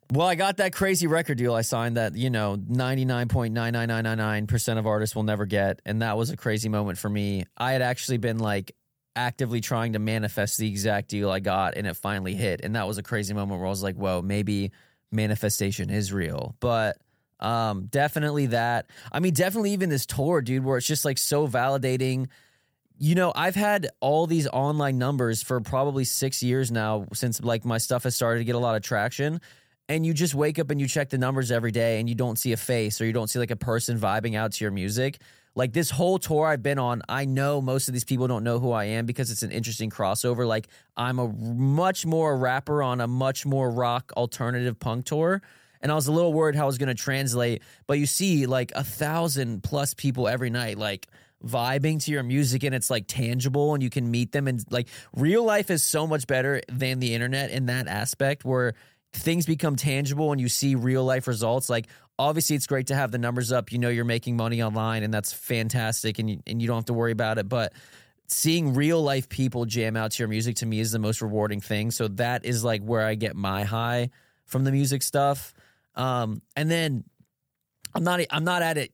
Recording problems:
none

